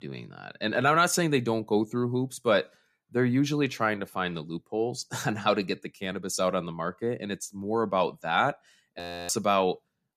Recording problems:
audio freezing; at 9 s

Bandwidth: 14.5 kHz